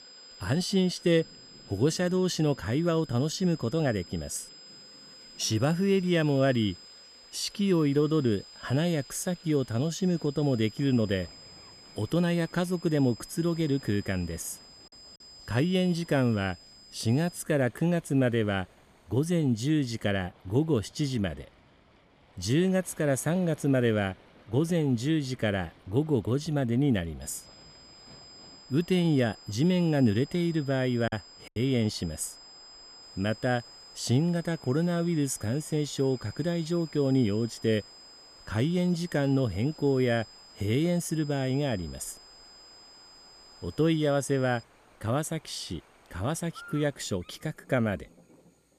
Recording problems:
electrical hum; faint; from 4.5 to 20 s and from 33 s on; 60 Hz, 30 dB below the speech
high-pitched whine; faint; until 17 s and from 27 to 45 s; 5 kHz, 20 dB below the speech
rain or running water; faint; throughout; 30 dB below the speech
choppy; very; at 31 s; 6% of the speech affected

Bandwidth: 14.5 kHz